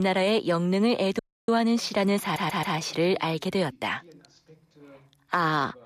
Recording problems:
voice in the background; faint; throughout; 30 dB below the speech
abrupt cut into speech; at the start
audio cutting out; at 1 s
audio stuttering; at 2 s

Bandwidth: 14.5 kHz